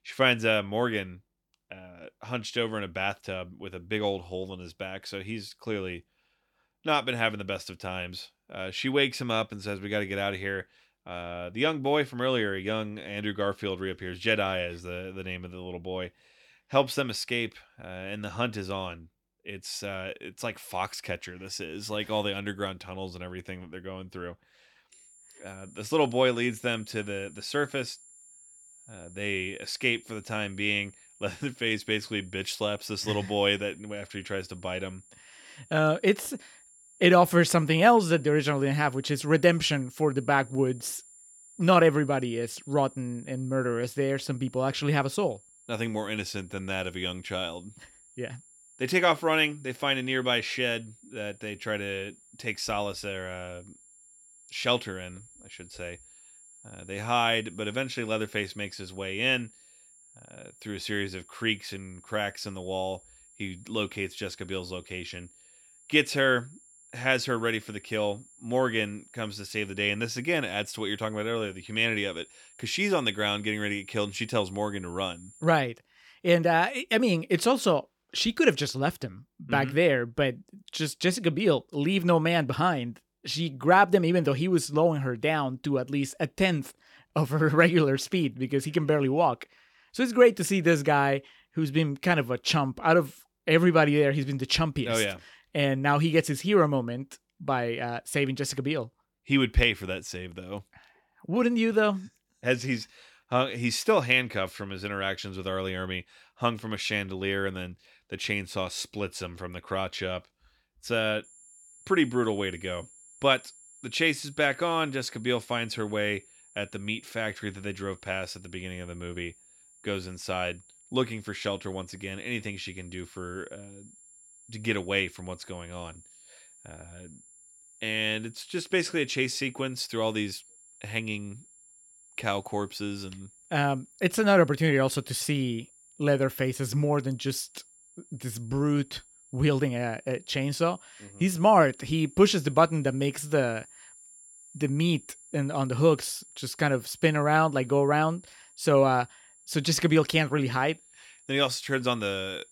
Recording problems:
high-pitched whine; faint; from 25 s to 1:16 and from 1:51 on; 7.5 kHz, 25 dB below the speech

